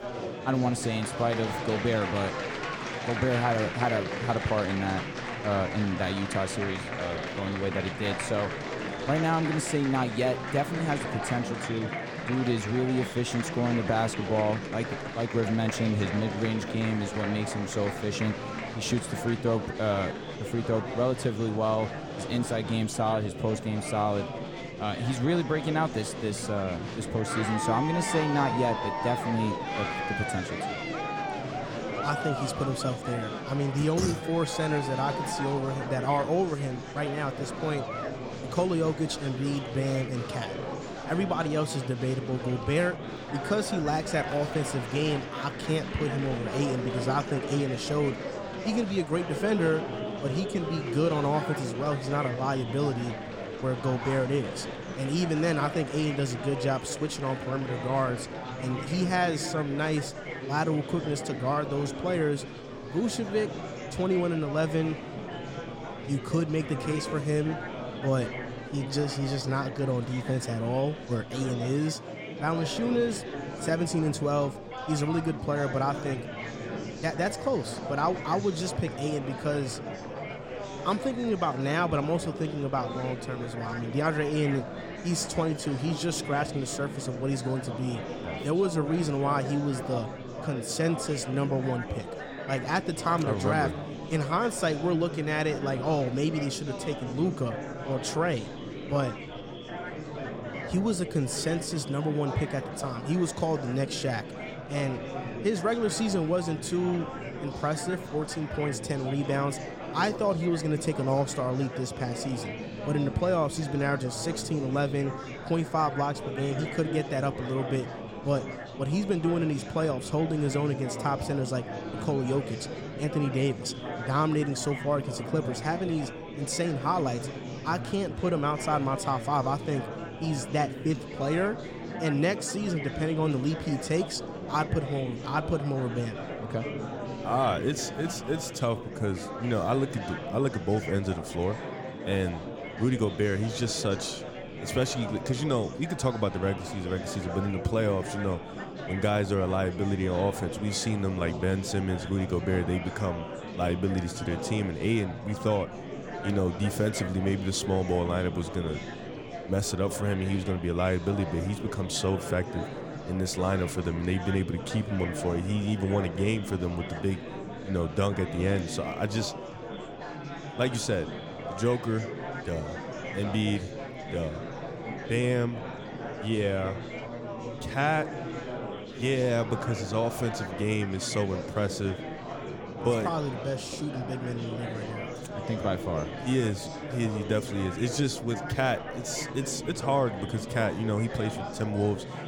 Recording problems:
murmuring crowd; loud; throughout; 6 dB below the speech

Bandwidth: 18 kHz